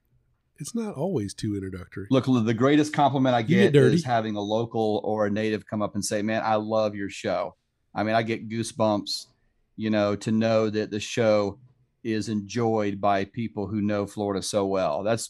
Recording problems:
none

